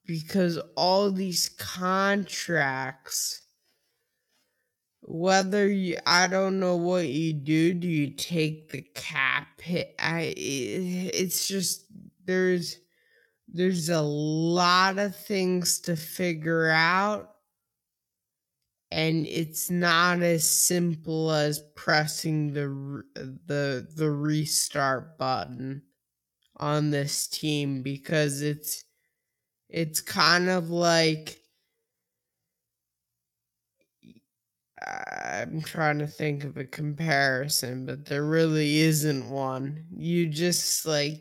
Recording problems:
wrong speed, natural pitch; too slow; 0.5 times normal speed

